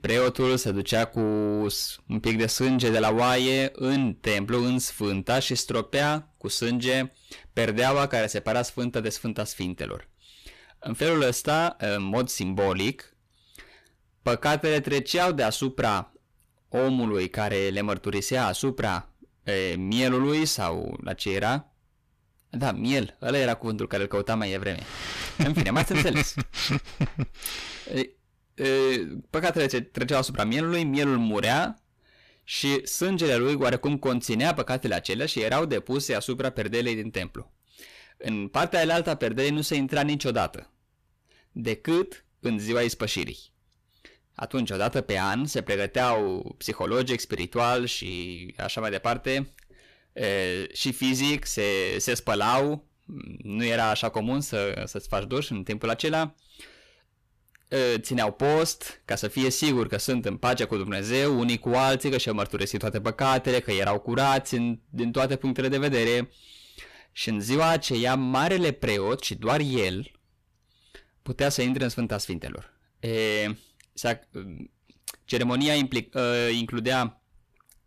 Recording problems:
distortion; heavy; 7 dB below the speech

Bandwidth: 14.5 kHz